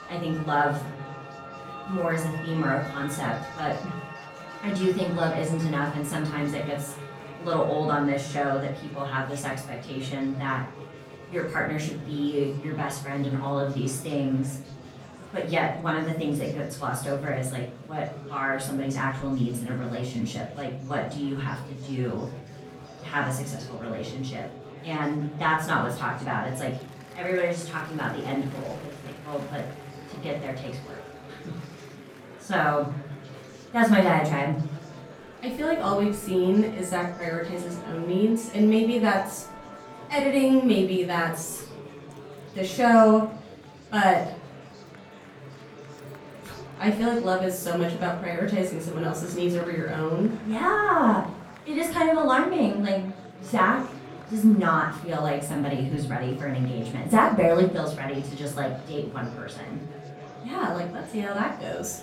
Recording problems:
off-mic speech; far
room echo; slight; dies away in 0.5 s
murmuring crowd; noticeable; throughout; 20 dB below the speech
background music; faint; throughout; 20 dB below the speech

